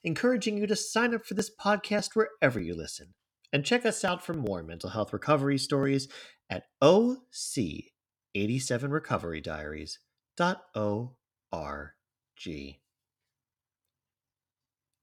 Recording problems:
none

